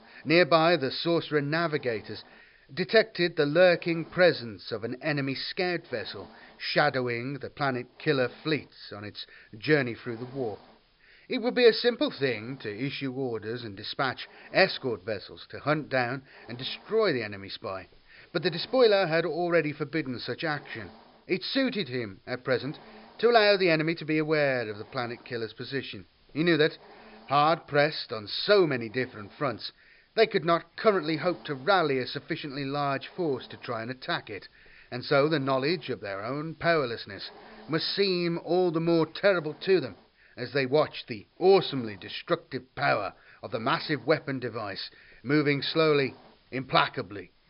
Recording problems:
high frequencies cut off; noticeable; nothing above 5.5 kHz
hiss; faint; throughout; 30 dB below the speech

